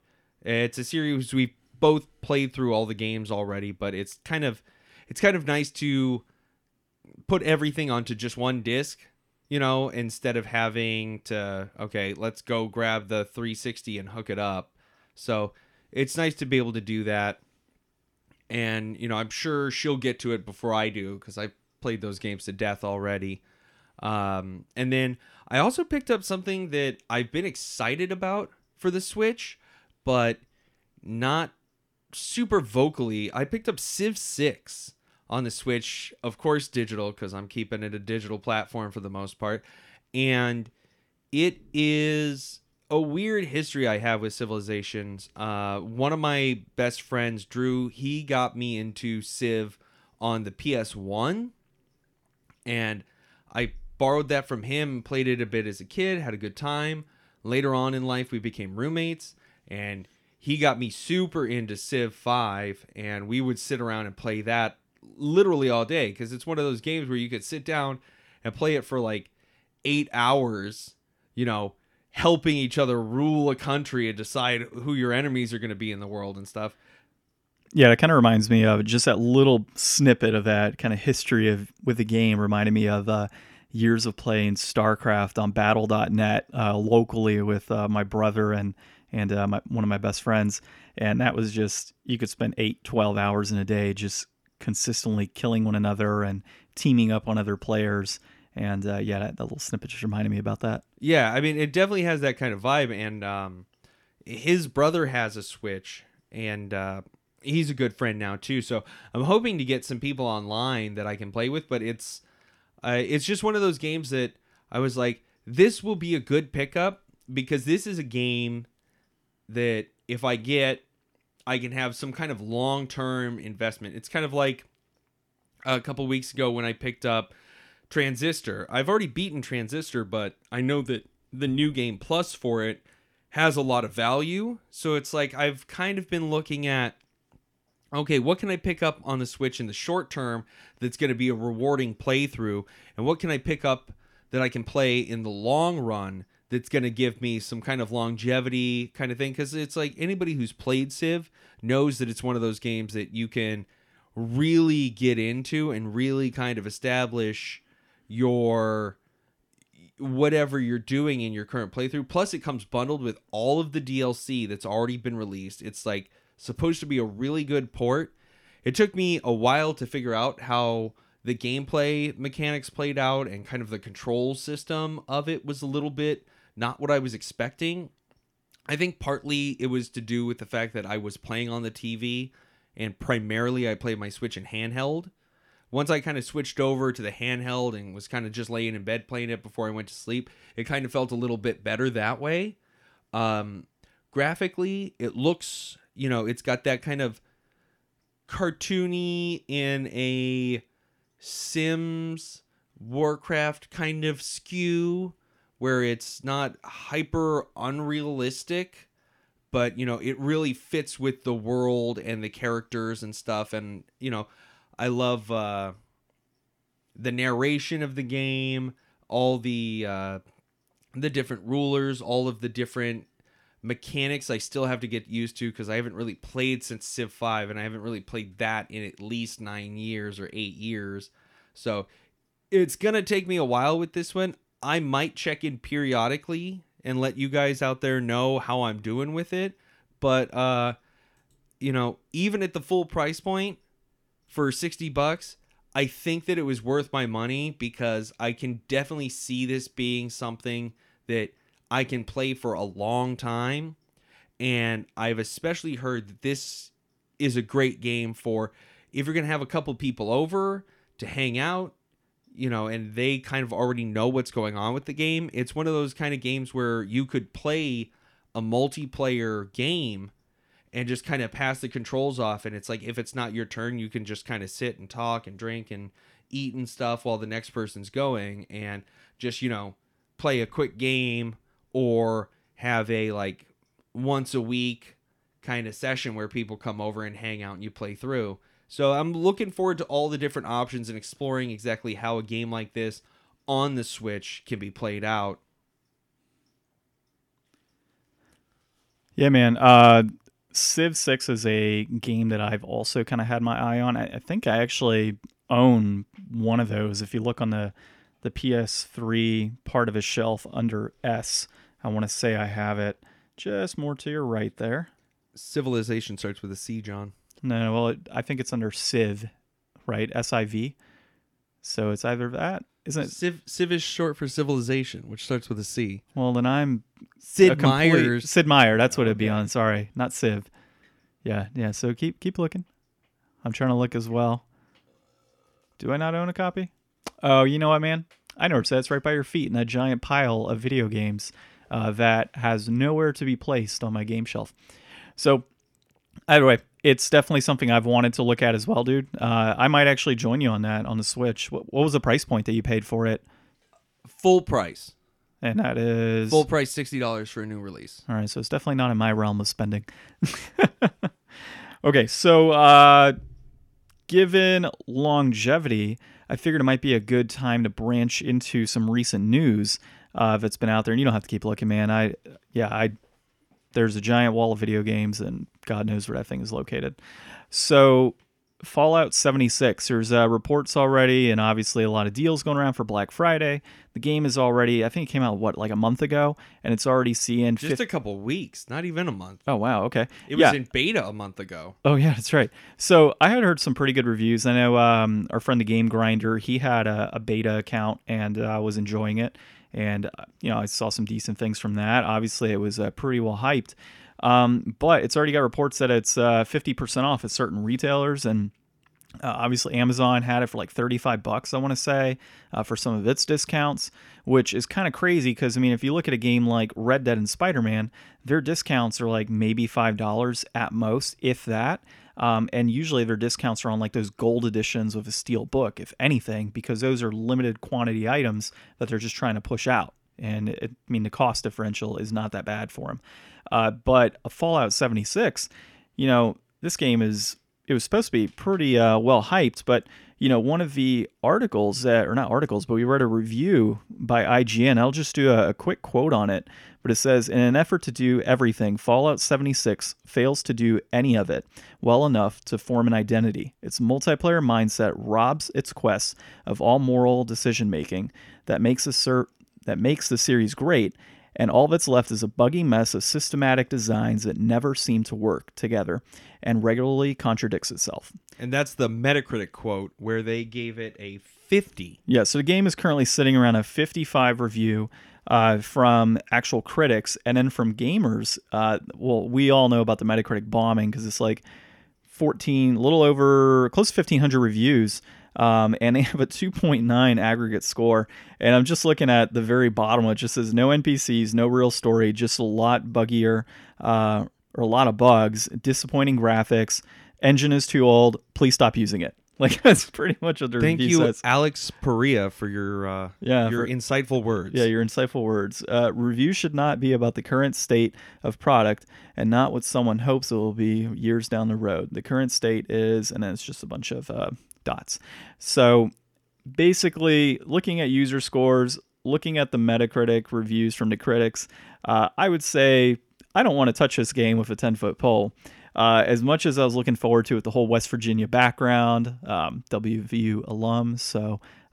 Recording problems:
none

